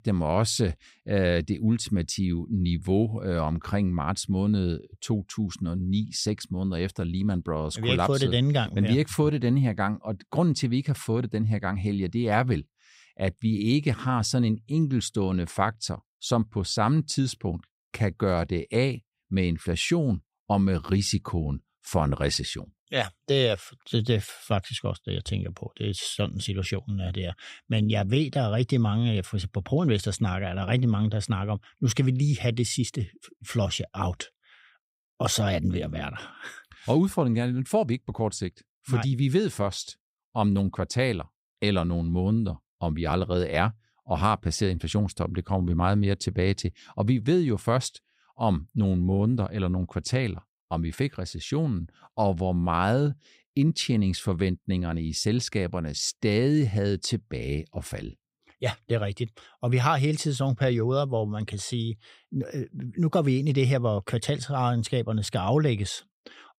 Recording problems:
none

